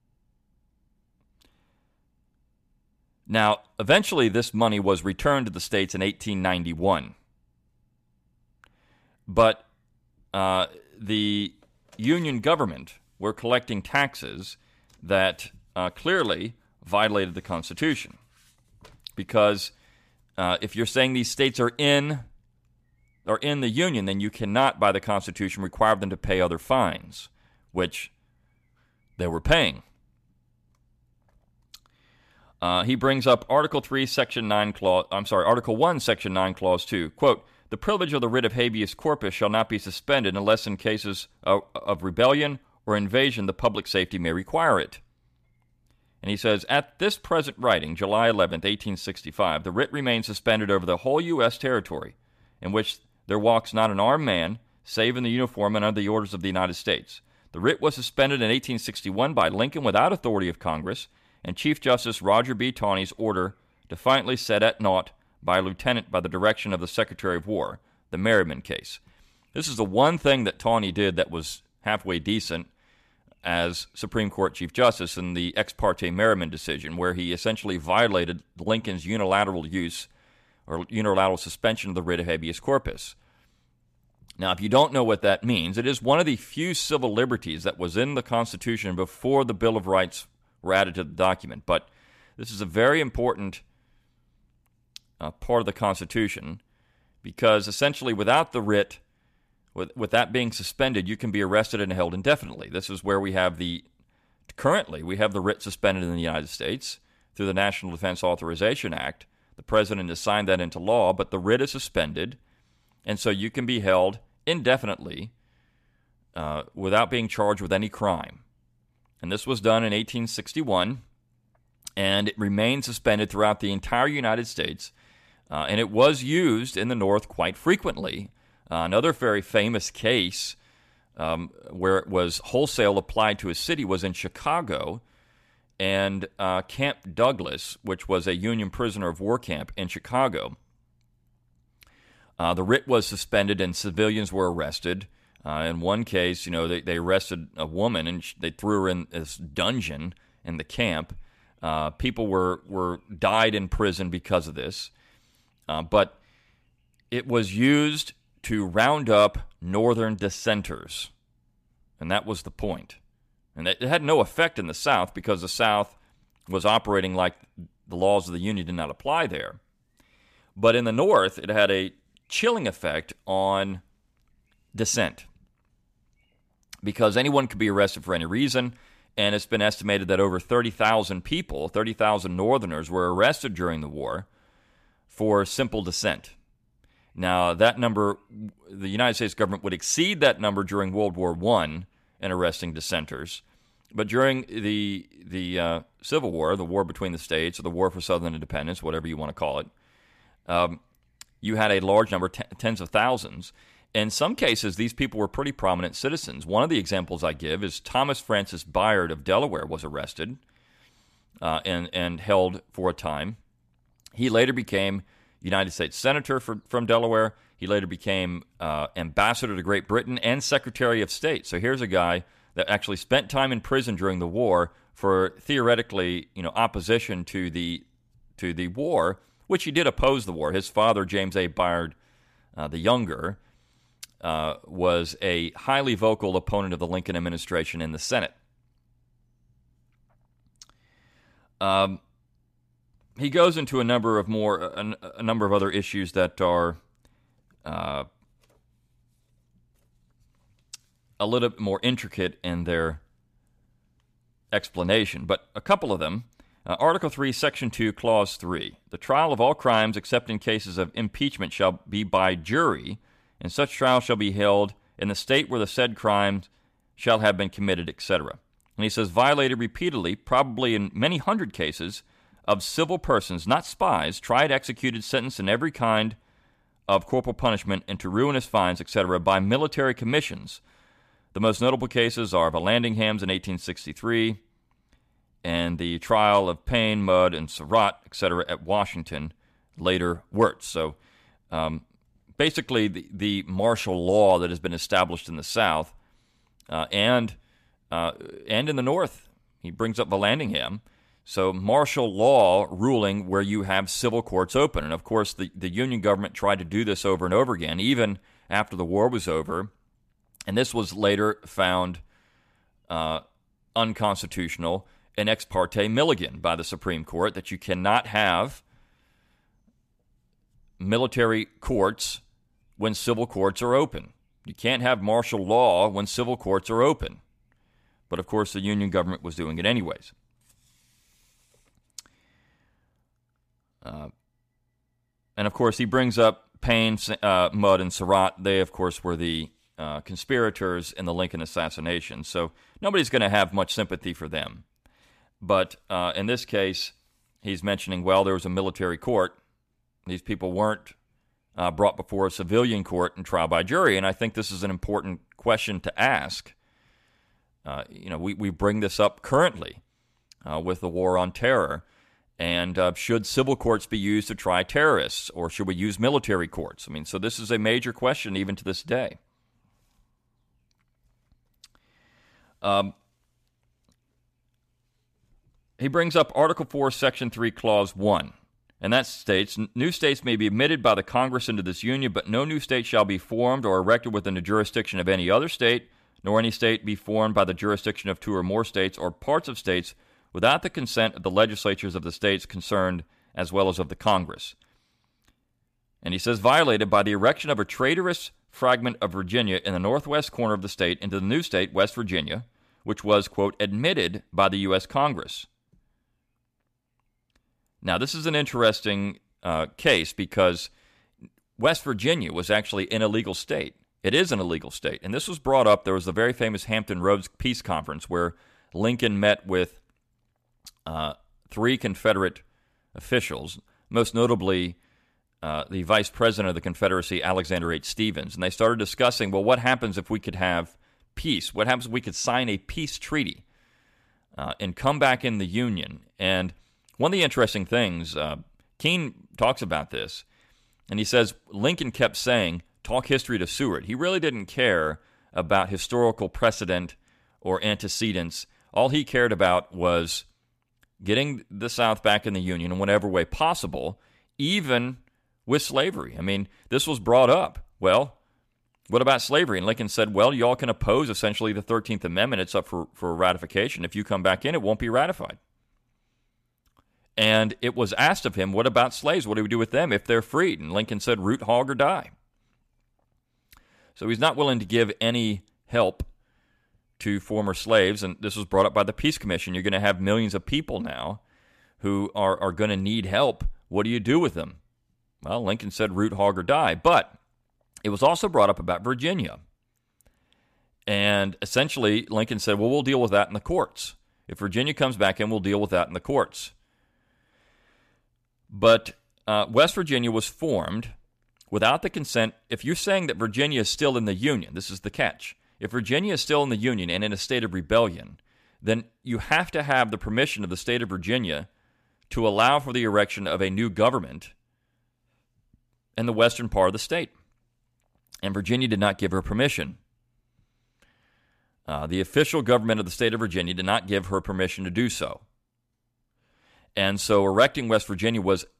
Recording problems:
none

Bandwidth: 14.5 kHz